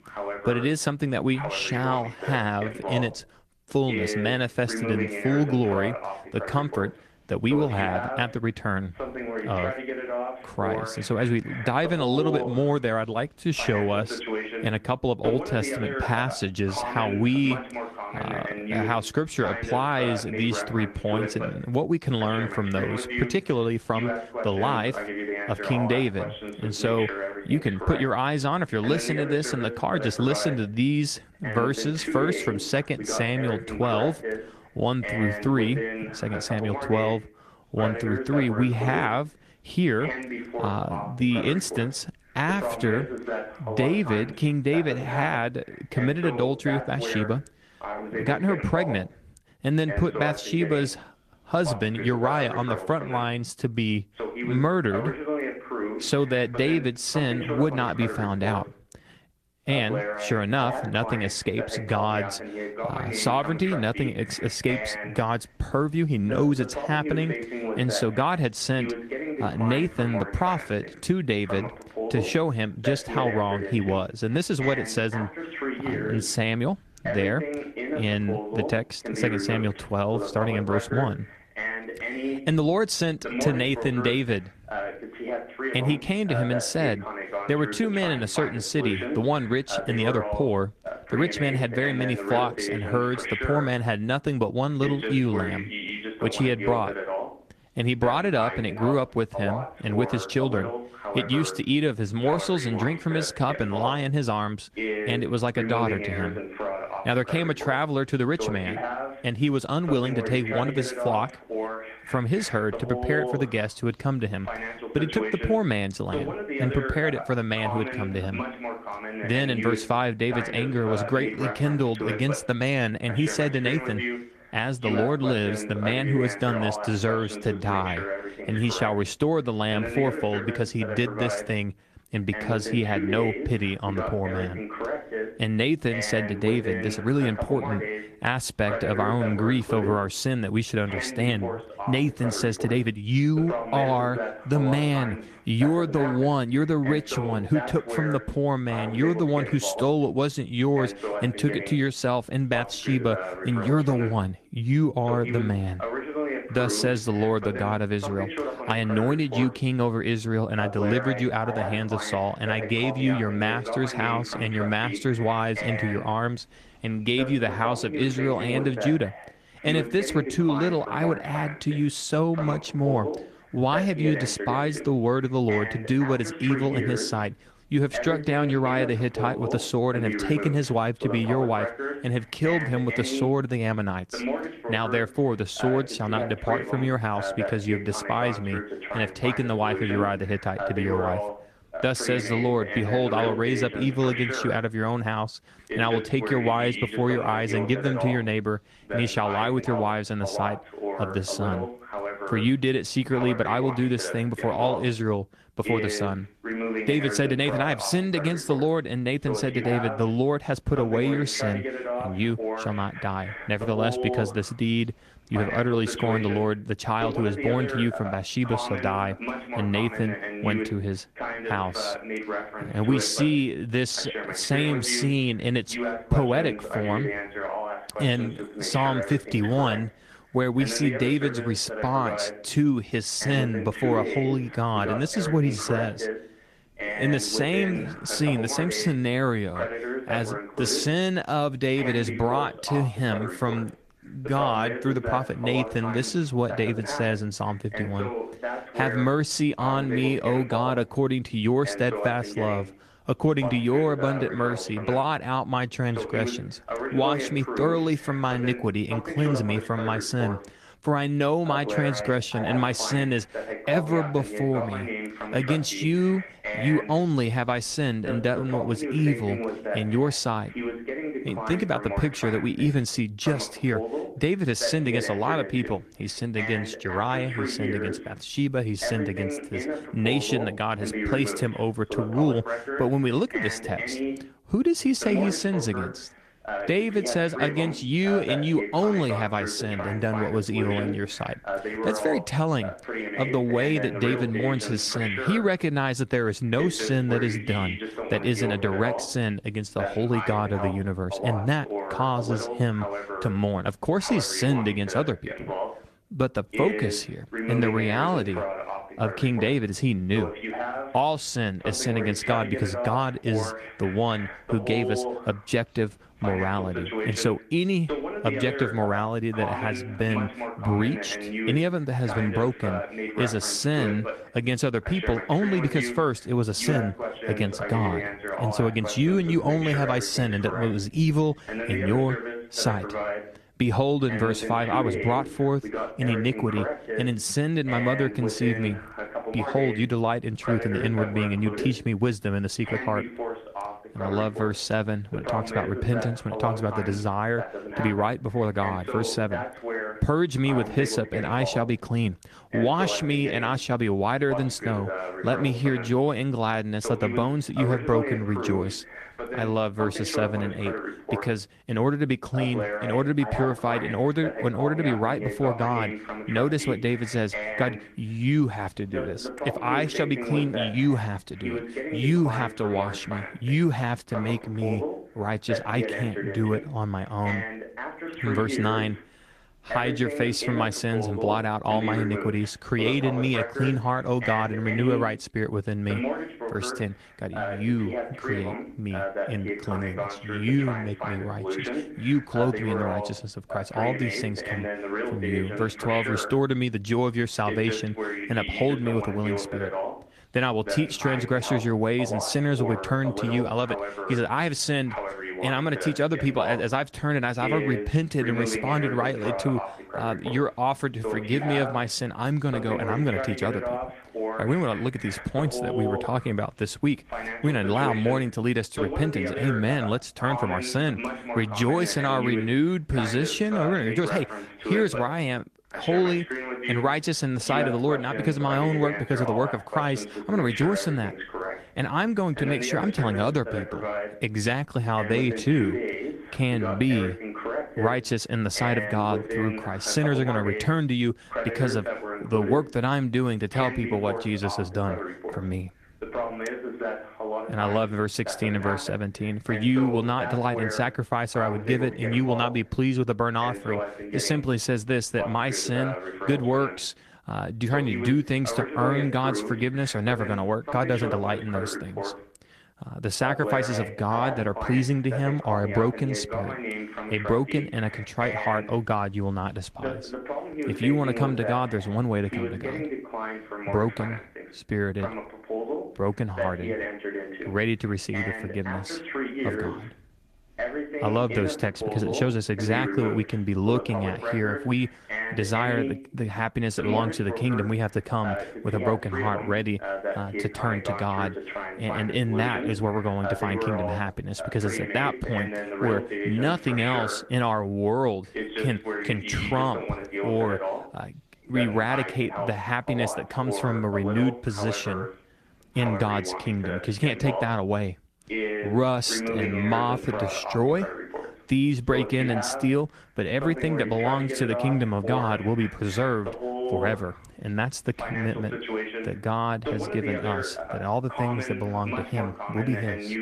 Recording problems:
garbled, watery; slightly
voice in the background; loud; throughout; 6 dB below the speech

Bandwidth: 14 kHz